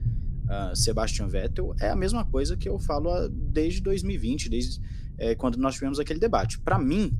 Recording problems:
low rumble; noticeable; throughout; 20 dB below the speech

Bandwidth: 15 kHz